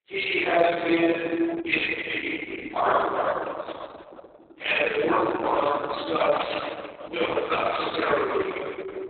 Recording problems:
room echo; strong; dies away in 3 s
off-mic speech; far
garbled, watery; badly; nothing above 4 kHz
thin; somewhat; fading below 300 Hz

